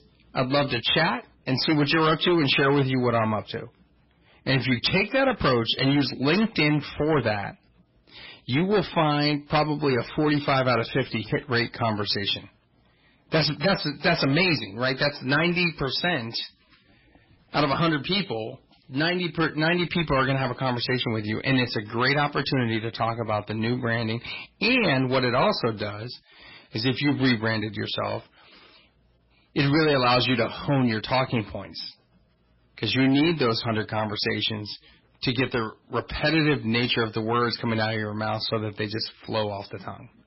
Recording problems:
distortion; heavy; 9% of the sound clipped
garbled, watery; badly; nothing above 5.5 kHz

